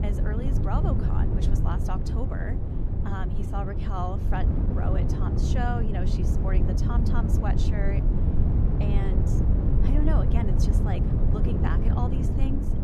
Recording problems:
wind noise on the microphone; heavy; 1 dB below the speech
low rumble; noticeable; throughout; 10 dB below the speech

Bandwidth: 14.5 kHz